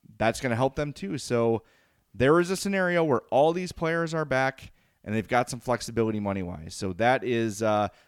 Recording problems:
none

